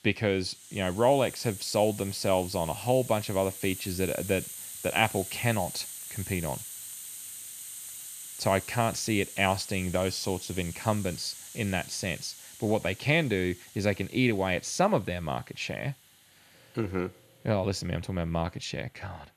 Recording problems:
hiss; noticeable; throughout; 10 dB below the speech

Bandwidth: 14.5 kHz